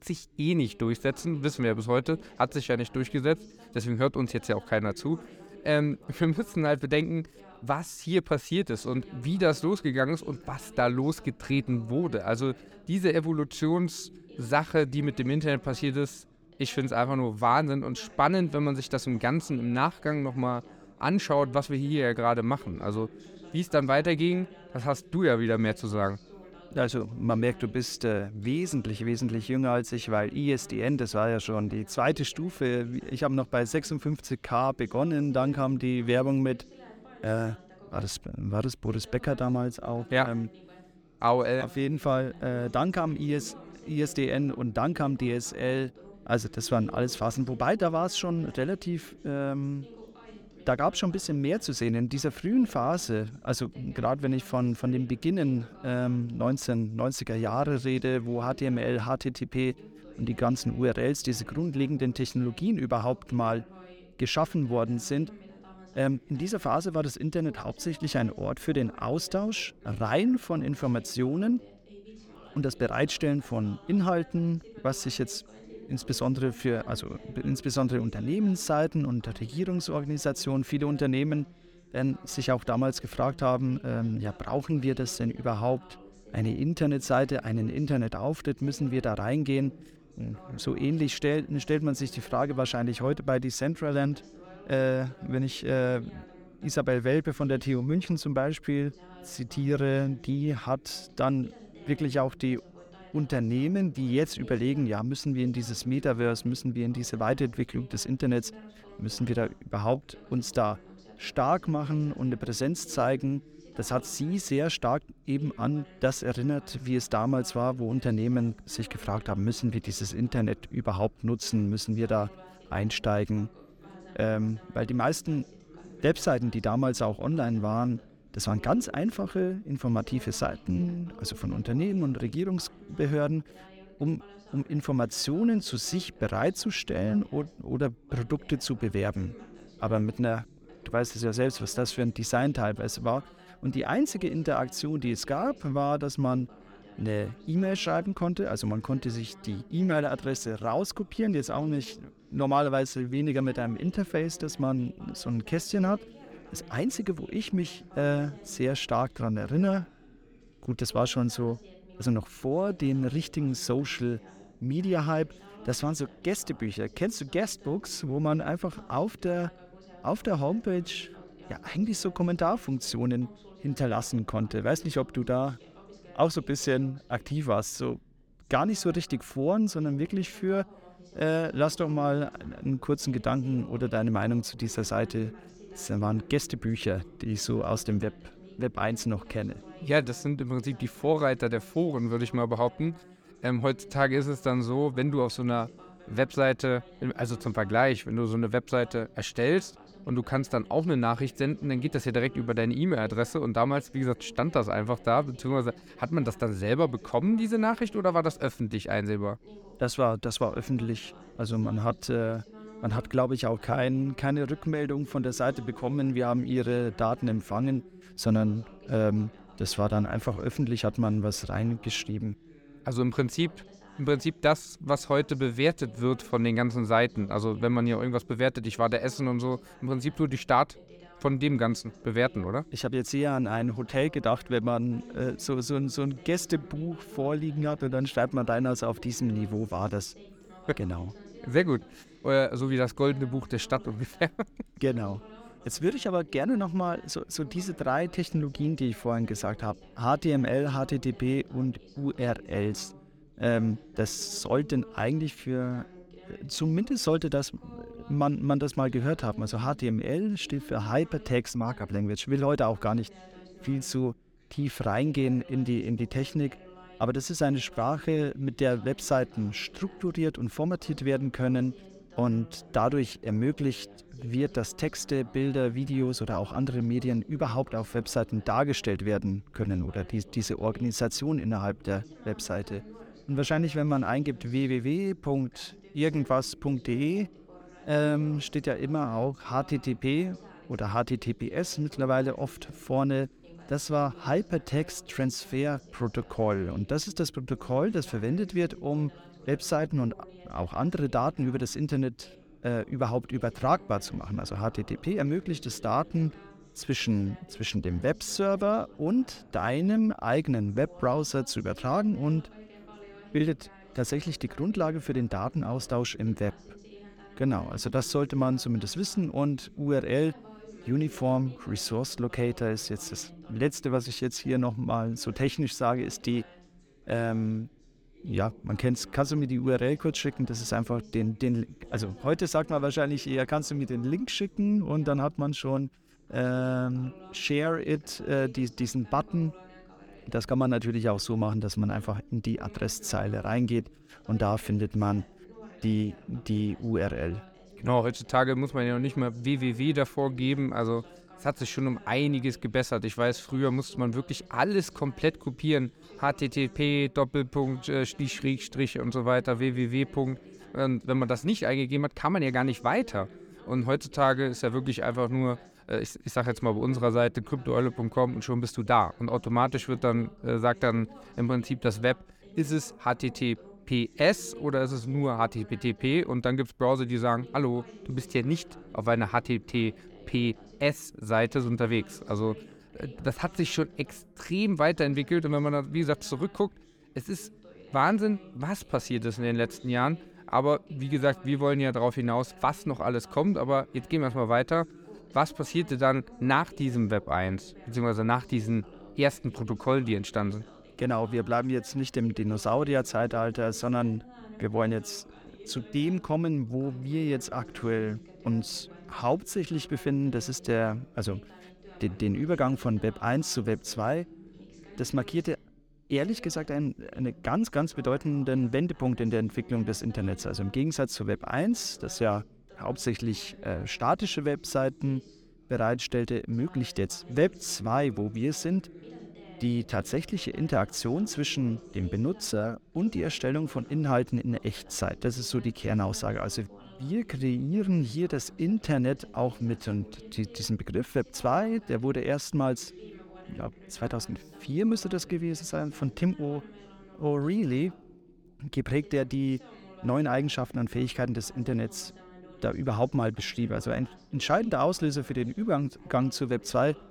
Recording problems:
background chatter; faint; throughout; 2 voices, 20 dB below the speech

